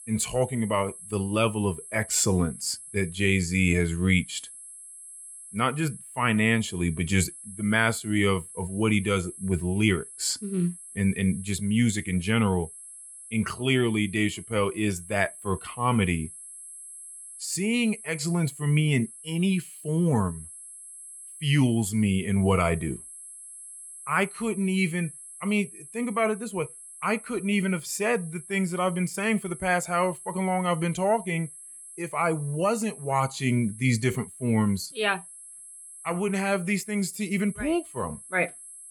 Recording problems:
high-pitched whine; noticeable; throughout; 11 kHz, 15 dB below the speech

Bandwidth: 17.5 kHz